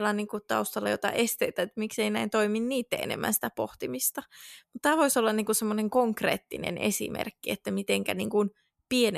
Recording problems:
abrupt cut into speech; at the start and the end

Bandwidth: 14.5 kHz